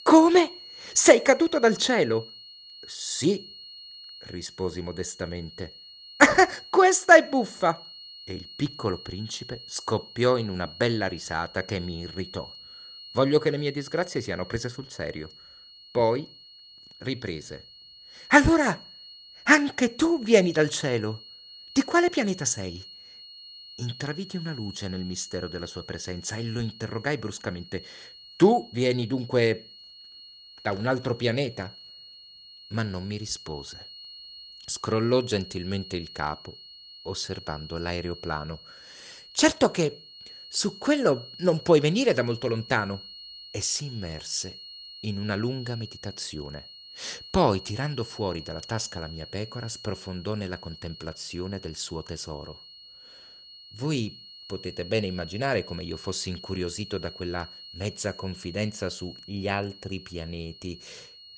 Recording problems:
high-pitched whine; noticeable; throughout; 4.5 kHz, 15 dB below the speech

